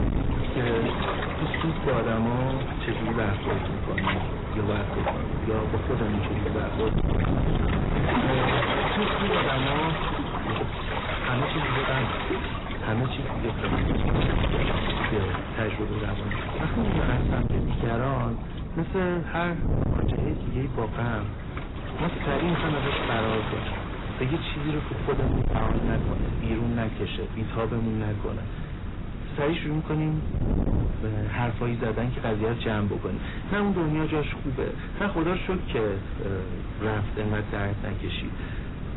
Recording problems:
distortion; heavy; 18% of the sound clipped
garbled, watery; badly; nothing above 4 kHz
wind noise on the microphone; heavy; 8 dB below the speech
rain or running water; loud; throughout; 1 dB below the speech

